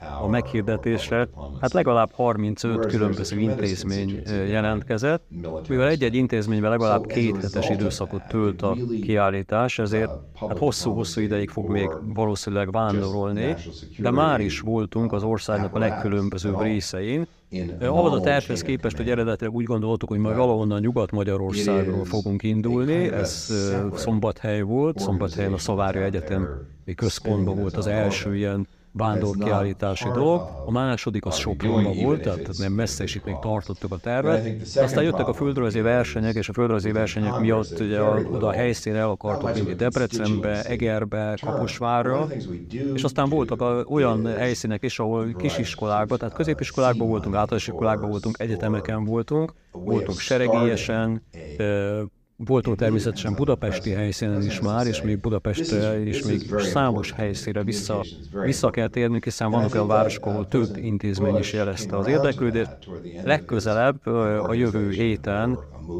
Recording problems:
voice in the background; loud; throughout; 7 dB below the speech

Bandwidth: 15.5 kHz